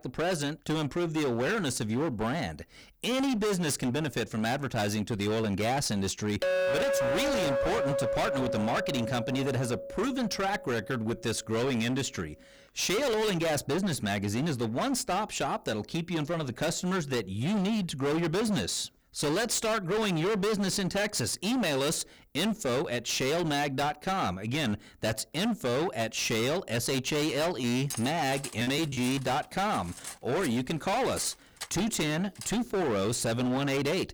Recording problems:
distortion; heavy; 28% of the sound clipped
clattering dishes; loud; from 6.5 to 10 s; peak 3 dB above the speech
choppy; very; from 28 to 29 s; 8% of the speech affected
clattering dishes; noticeable; from 28 to 33 s; peak 8 dB below the speech

